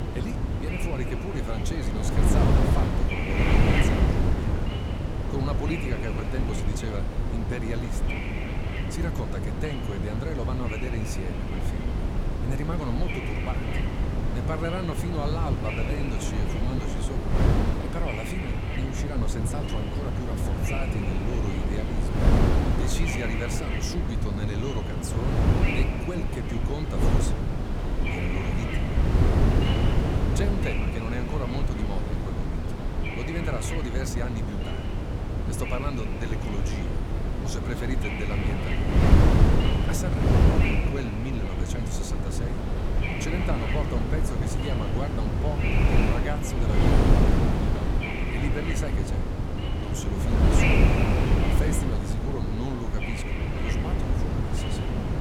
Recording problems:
wind noise on the microphone; heavy; 5 dB above the speech

